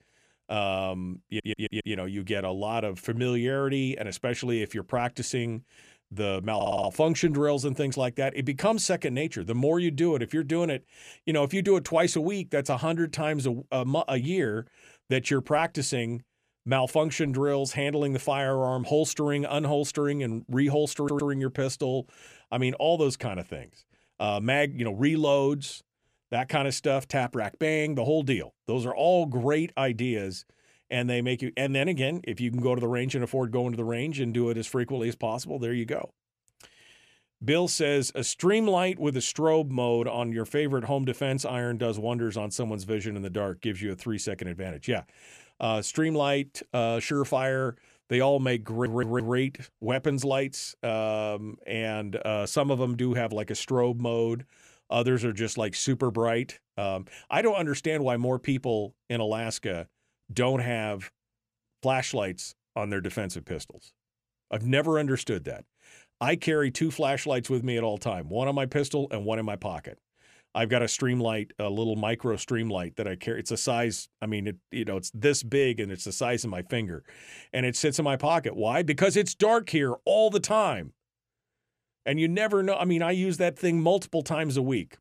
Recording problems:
audio stuttering; 4 times, first at 1.5 s

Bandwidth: 14.5 kHz